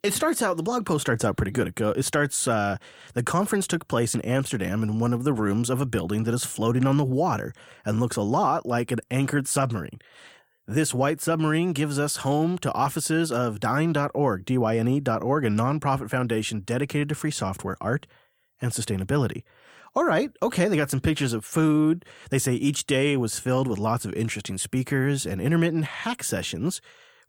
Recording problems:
none

